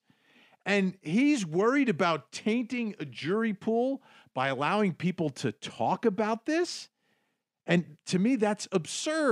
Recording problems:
abrupt cut into speech; at the end

